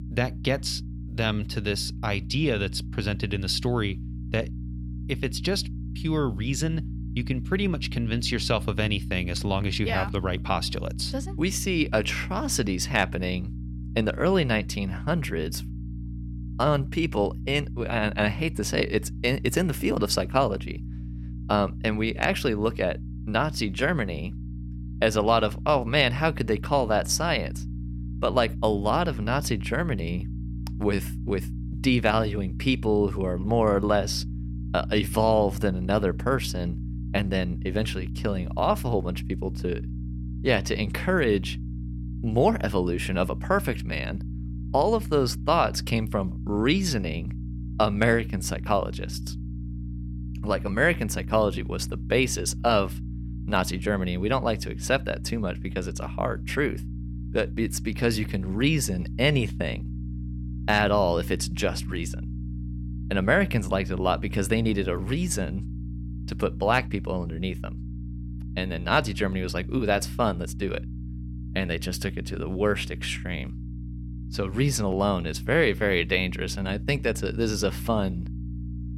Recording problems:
electrical hum; noticeable; throughout; 60 Hz, 20 dB below the speech

